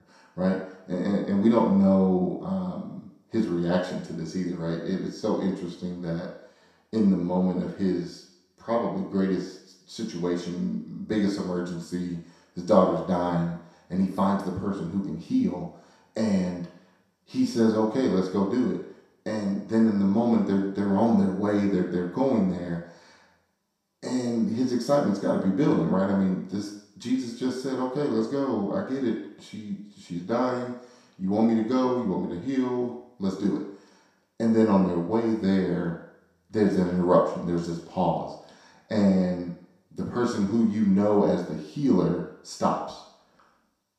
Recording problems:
off-mic speech; far
room echo; noticeable; dies away in 0.7 s

